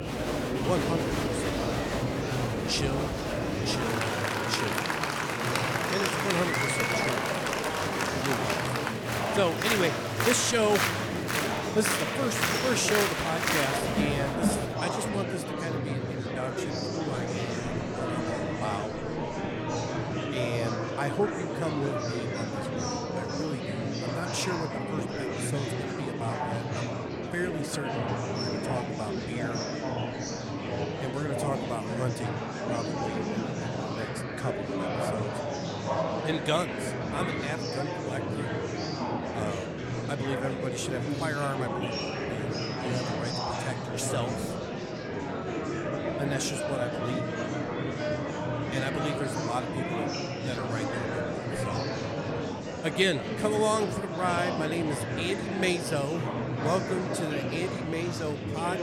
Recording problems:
murmuring crowd; very loud; throughout; 2 dB above the speech

